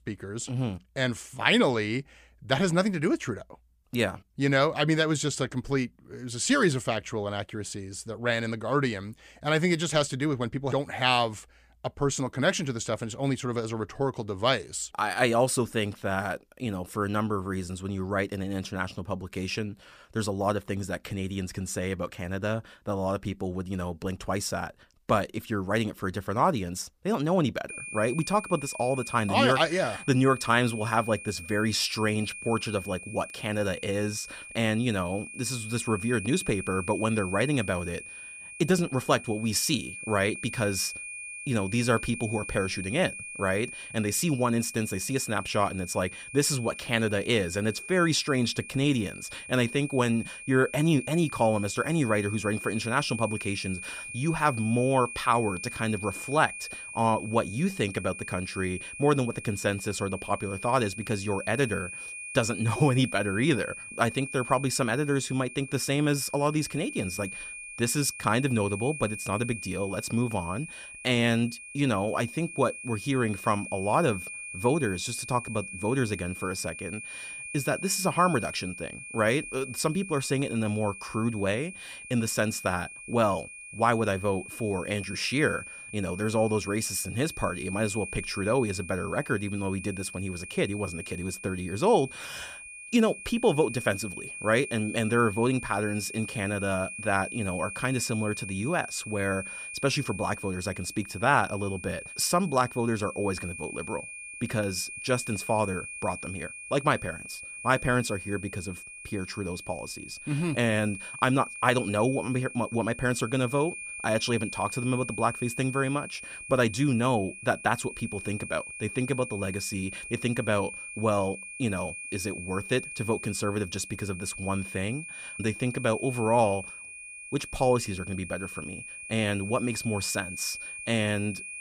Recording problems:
high-pitched whine; noticeable; from 28 s on; 2.5 kHz, 10 dB below the speech

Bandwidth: 15 kHz